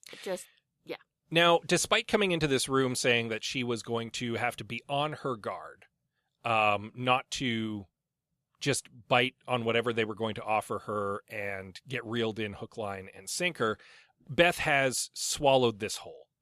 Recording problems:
none

